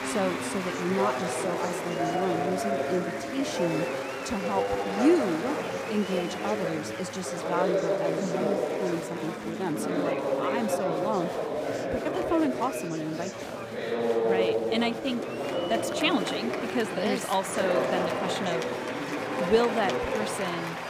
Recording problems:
chatter from many people; very loud; throughout; 1 dB above the speech

